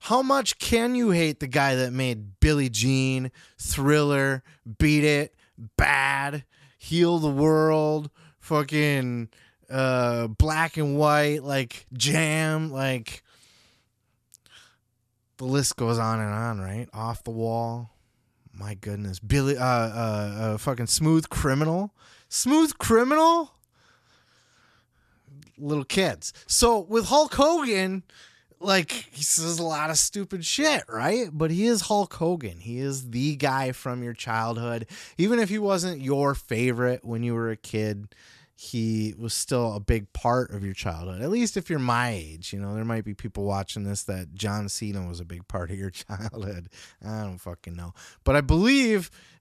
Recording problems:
none

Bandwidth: 13.5 kHz